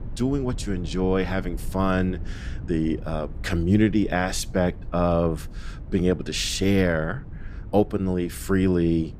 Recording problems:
low rumble; faint; throughout; 25 dB below the speech

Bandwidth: 15 kHz